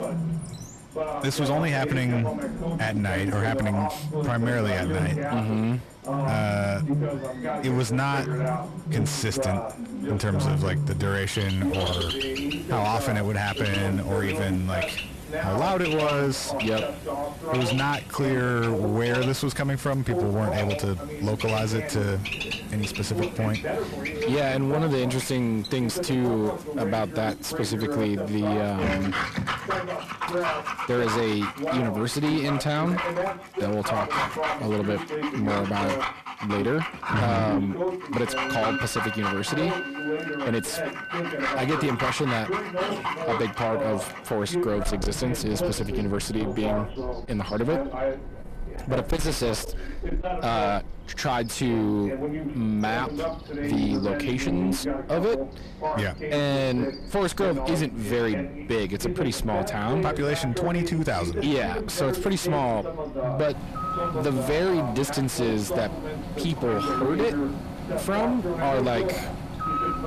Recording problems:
distortion; slight; 10 dB below the speech
animal sounds; loud; throughout; 6 dB below the speech
voice in the background; loud; throughout; 5 dB below the speech
background music; noticeable; throughout; 15 dB below the speech

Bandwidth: 14 kHz